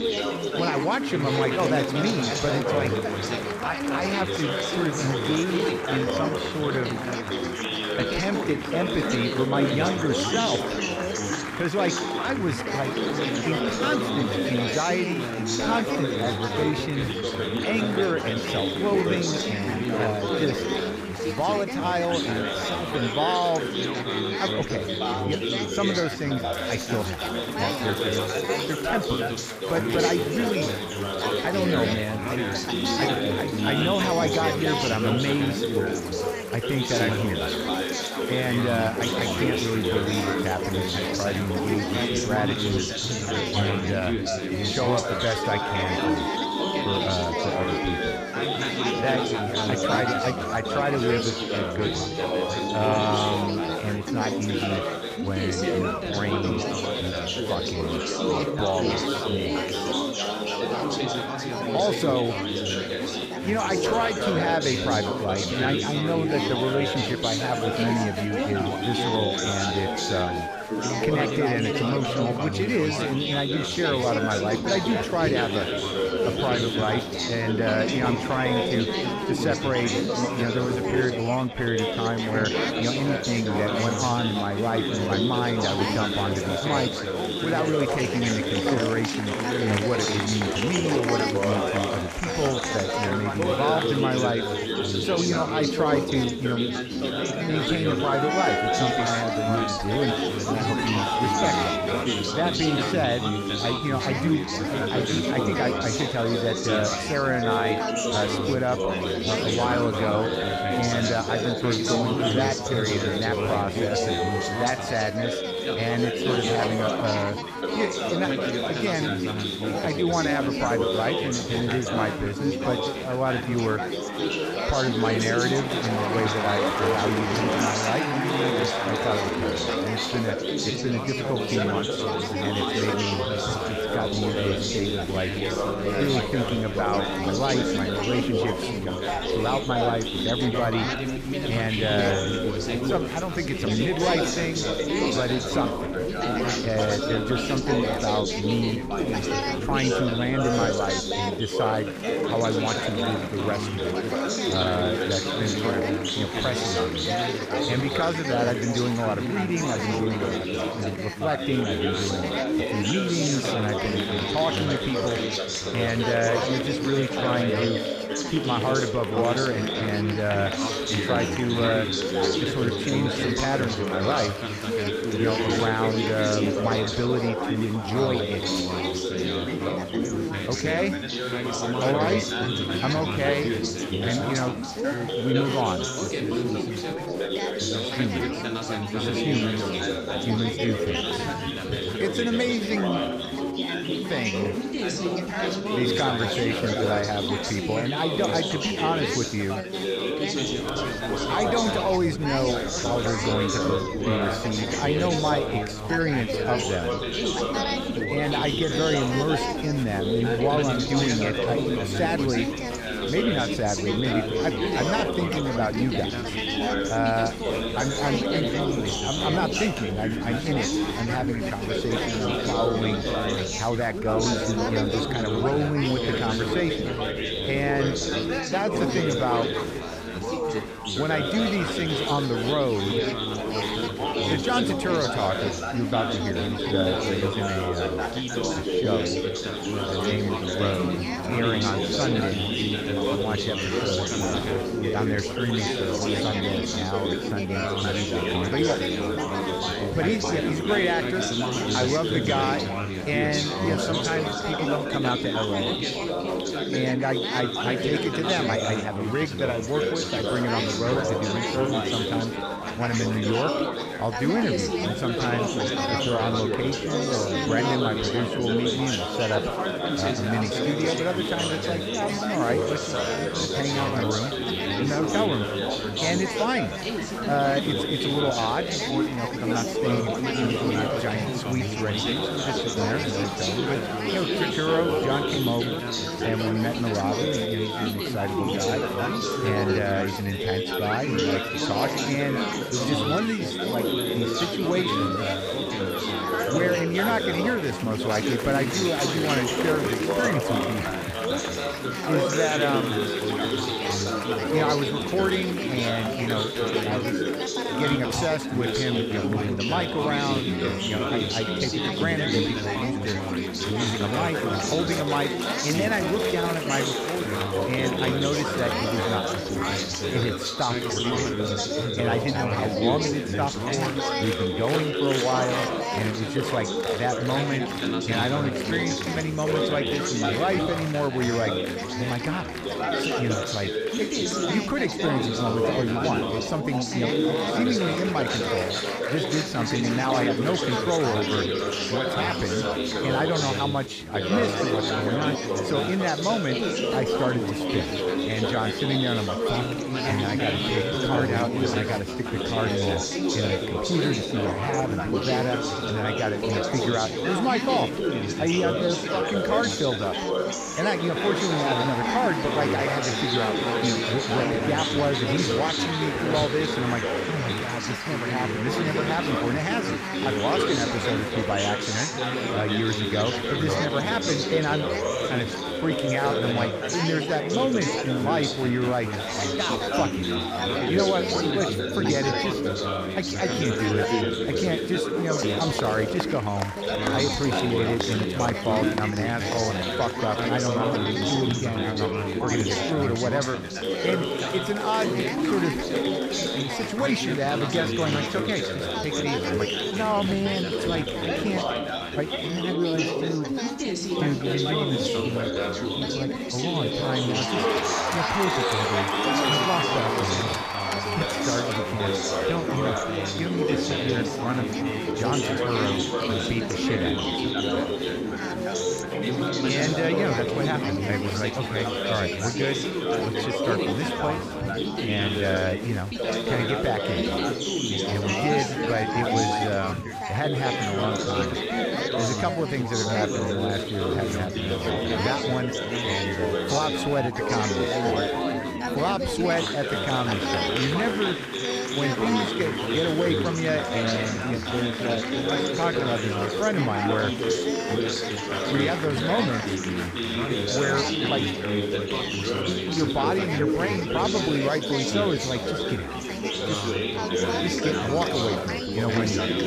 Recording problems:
chatter from many people; very loud; throughout; 2 dB above the speech

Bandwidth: 15 kHz